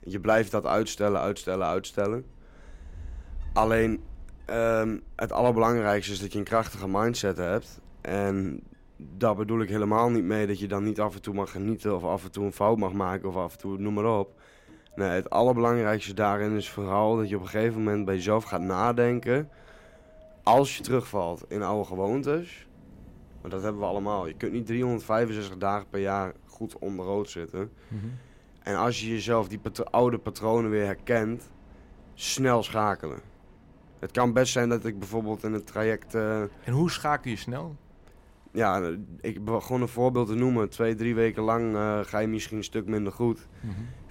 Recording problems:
wind in the background; faint; throughout; 25 dB below the speech

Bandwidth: 16 kHz